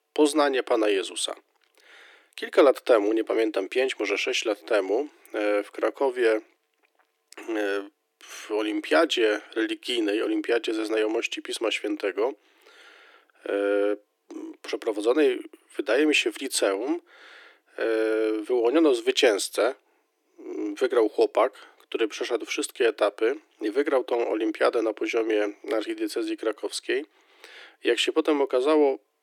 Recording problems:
thin; very; fading below 300 Hz

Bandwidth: 17.5 kHz